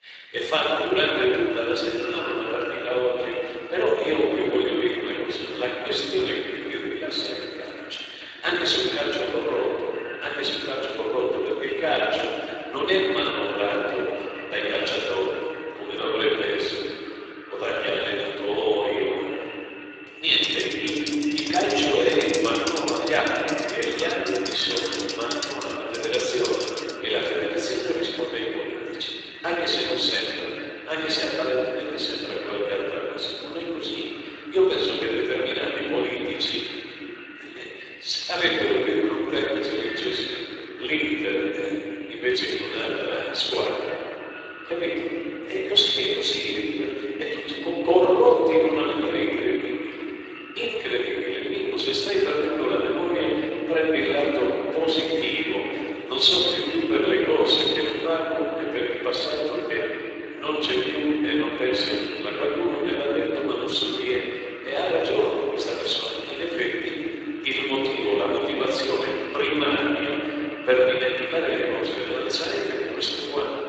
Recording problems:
room echo; strong; dies away in 3 s
off-mic speech; far
echo of what is said; noticeable; throughout; 480 ms later, 15 dB below the speech
thin; somewhat; fading below 300 Hz
garbled, watery; slightly; nothing above 7.5 kHz
keyboard typing; noticeable; from 20 to 27 s; peak 5 dB below the speech

